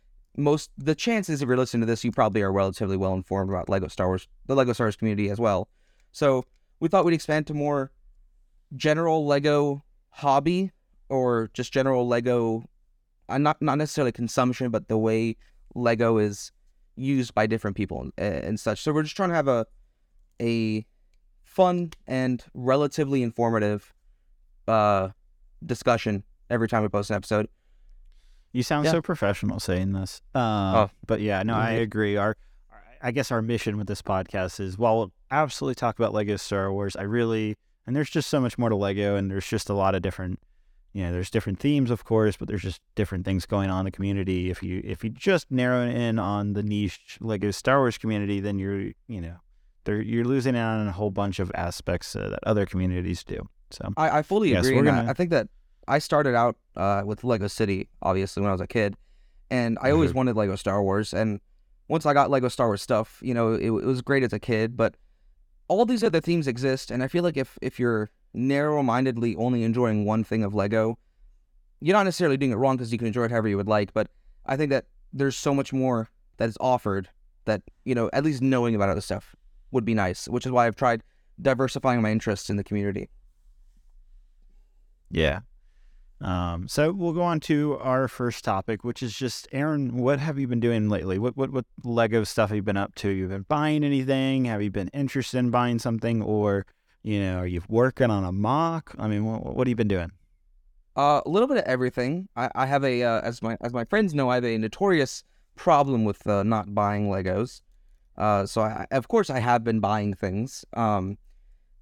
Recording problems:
none

